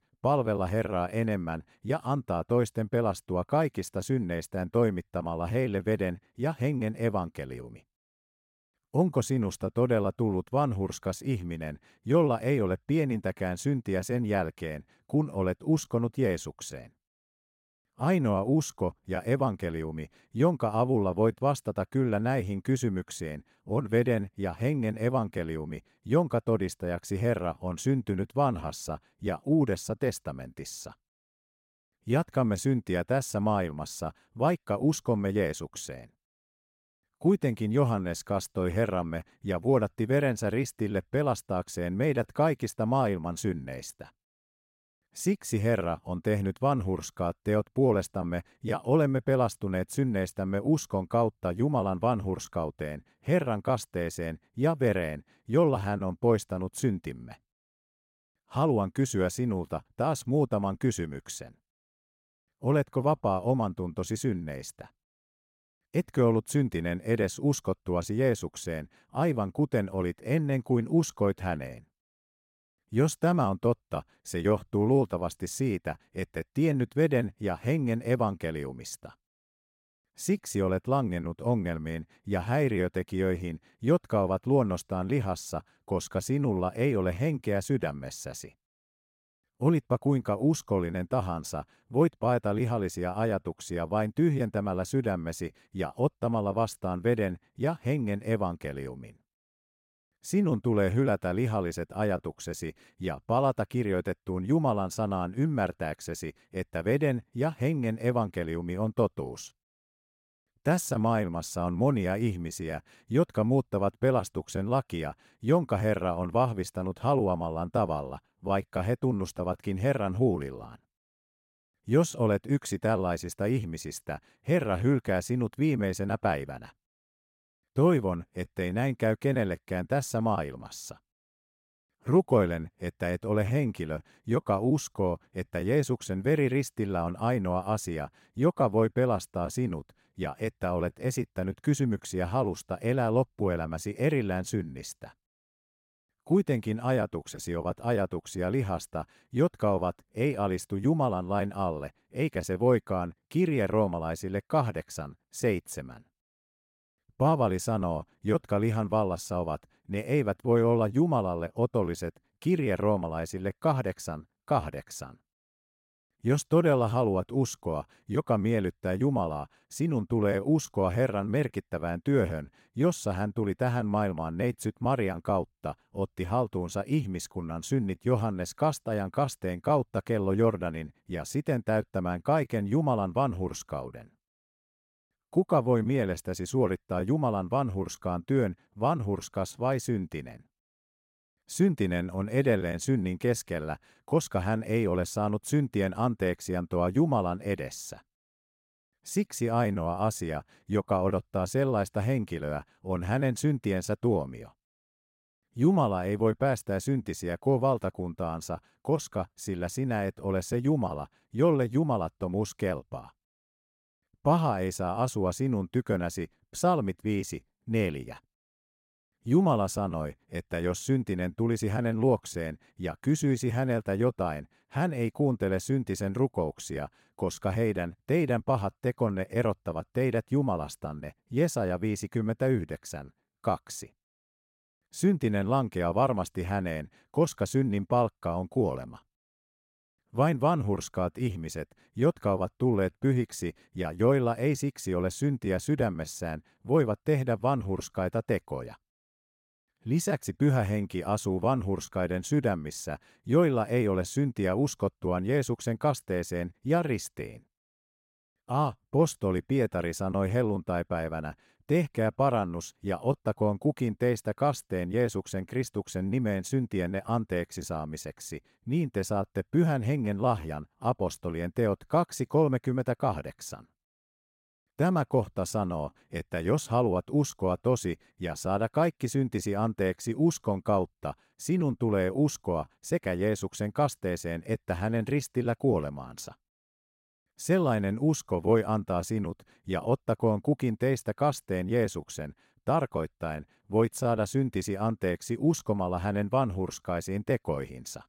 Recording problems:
none

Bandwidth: 16 kHz